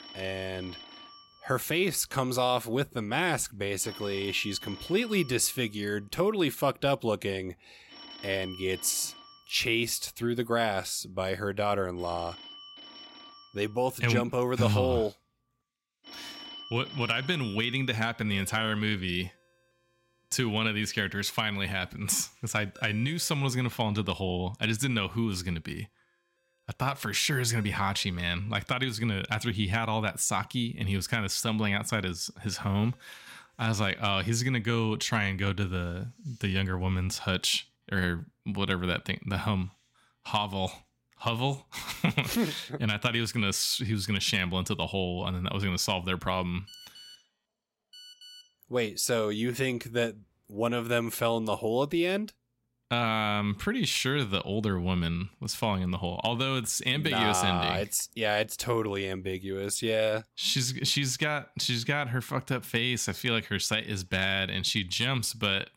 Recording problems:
alarms or sirens; noticeable; throughout; 20 dB below the speech
phone ringing; faint; from 47 to 48 s; peak 20 dB below the speech

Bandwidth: 16 kHz